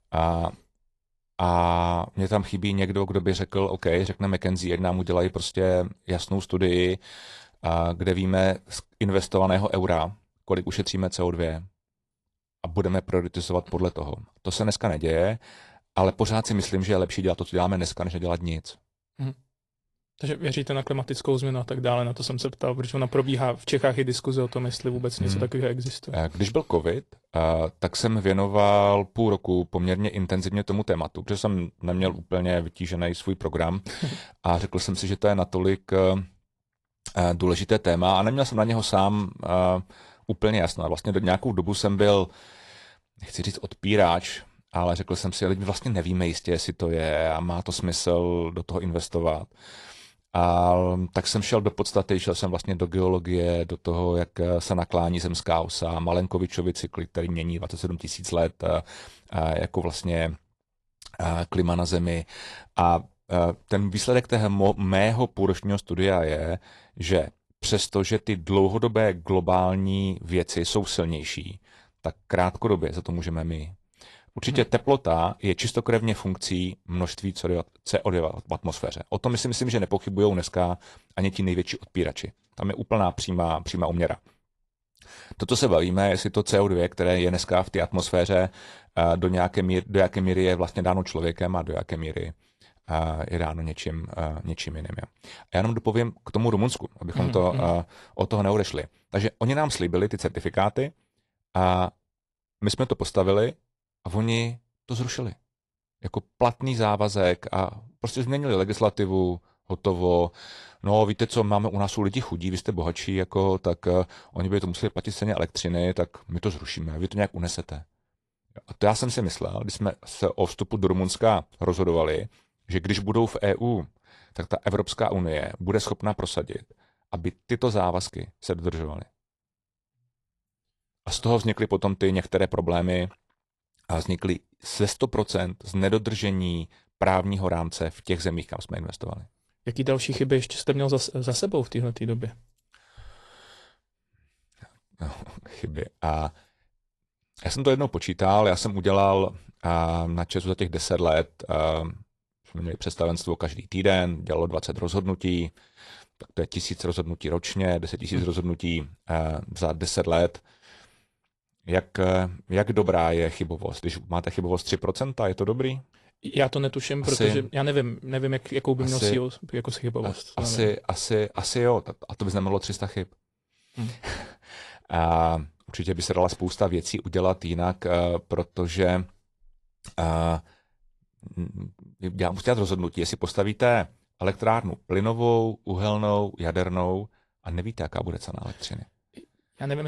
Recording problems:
garbled, watery; slightly
abrupt cut into speech; at the end

